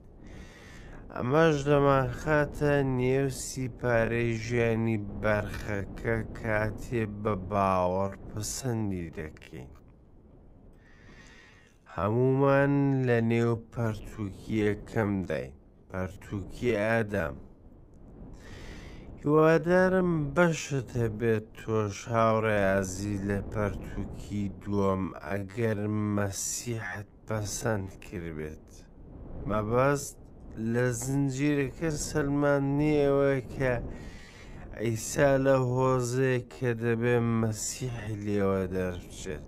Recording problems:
wrong speed, natural pitch; too slow; 0.5 times normal speed
wind noise on the microphone; occasional gusts; 25 dB below the speech

